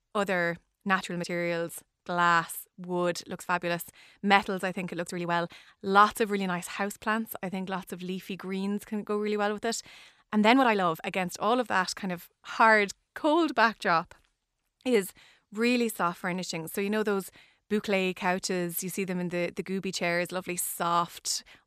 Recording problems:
uneven, jittery; strongly; from 0.5 to 20 s

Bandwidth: 14.5 kHz